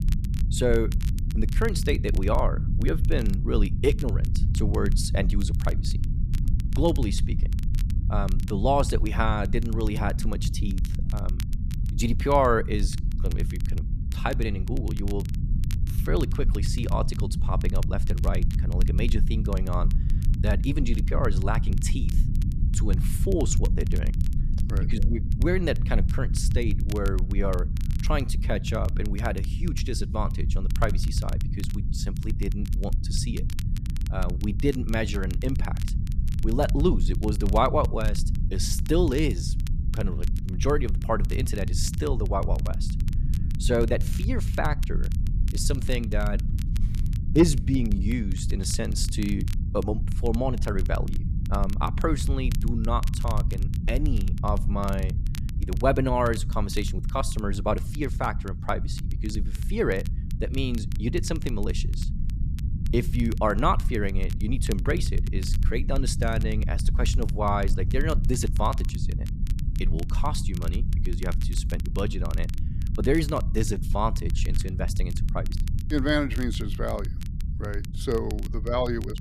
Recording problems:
low rumble; noticeable; throughout; 15 dB below the speech
crackle, like an old record; noticeable; 20 dB below the speech

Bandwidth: 14.5 kHz